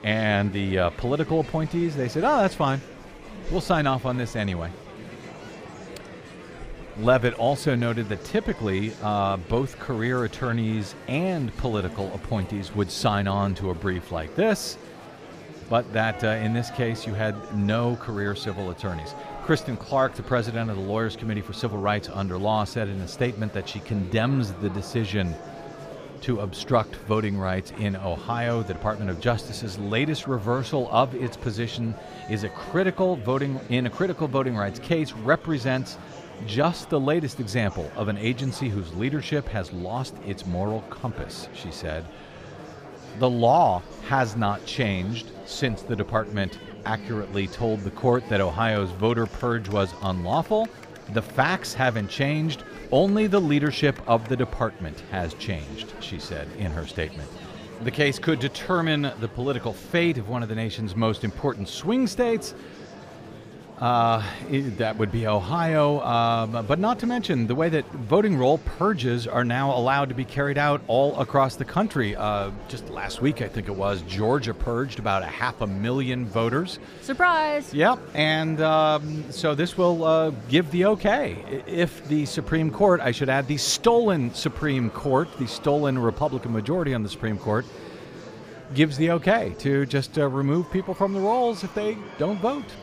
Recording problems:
murmuring crowd; noticeable; throughout; 15 dB below the speech

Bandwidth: 15 kHz